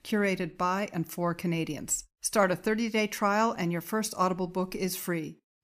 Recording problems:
none

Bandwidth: 15 kHz